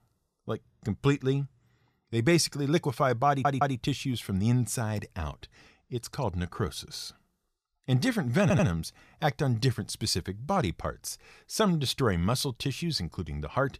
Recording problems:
audio stuttering; at 3.5 s and at 8.5 s

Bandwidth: 14.5 kHz